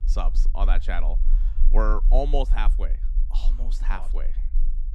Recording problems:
low rumble; faint; throughout; 20 dB below the speech

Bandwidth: 13.5 kHz